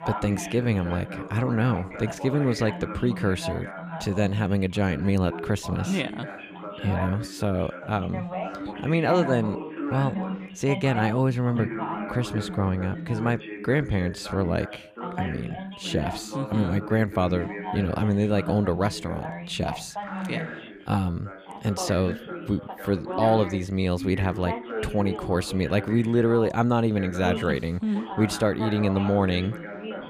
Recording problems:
background chatter; loud; throughout; 2 voices, 9 dB below the speech

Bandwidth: 15 kHz